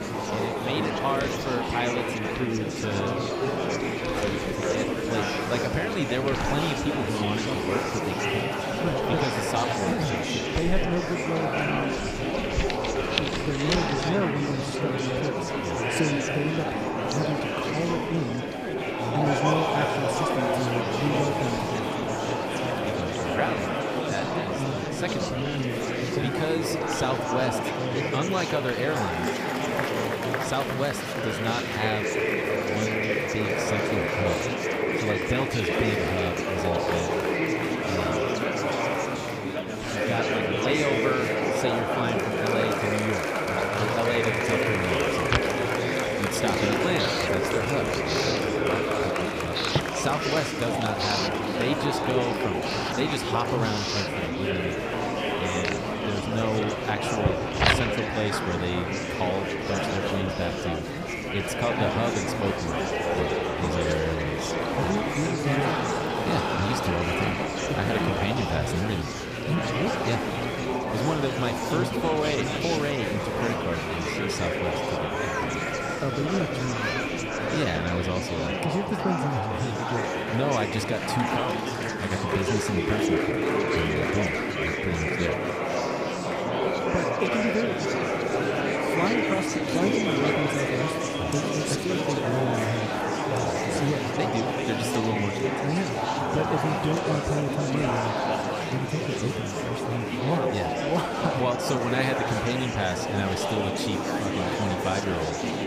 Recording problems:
murmuring crowd; very loud; throughout; 3 dB above the speech
household noises; loud; throughout; 6 dB below the speech

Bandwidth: 15 kHz